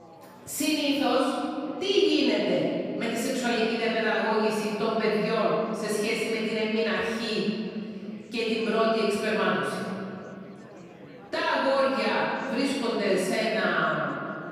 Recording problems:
room echo; strong; dies away in 2.4 s
off-mic speech; far
chatter from many people; faint; throughout; 20 dB below the speech

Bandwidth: 15 kHz